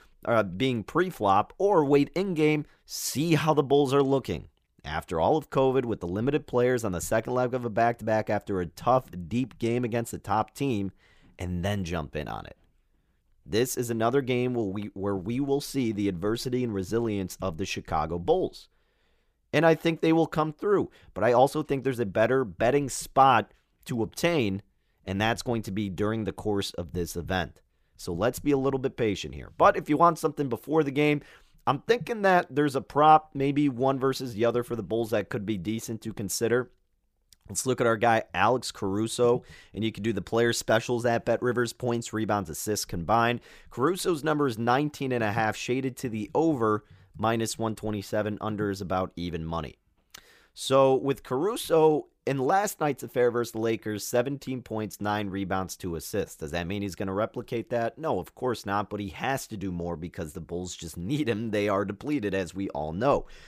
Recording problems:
none

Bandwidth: 15 kHz